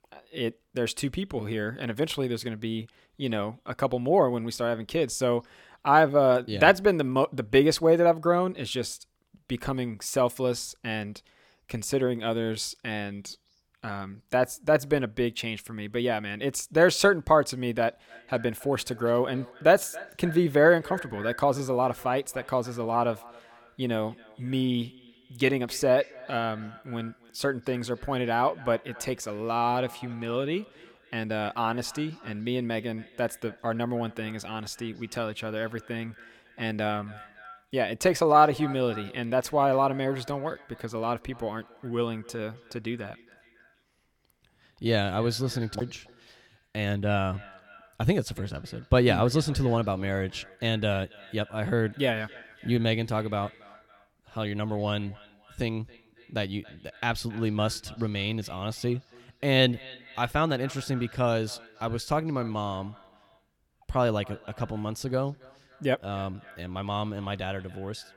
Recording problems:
echo of what is said; faint; from 18 s on; 280 ms later, 20 dB below the speech

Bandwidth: 17.5 kHz